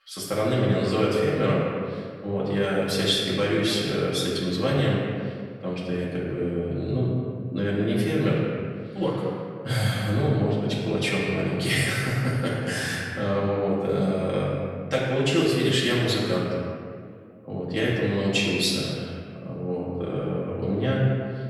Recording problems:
off-mic speech; far
room echo; noticeable; dies away in 1.8 s

